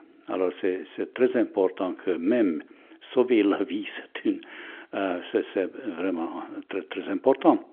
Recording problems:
phone-call audio; nothing above 3.5 kHz

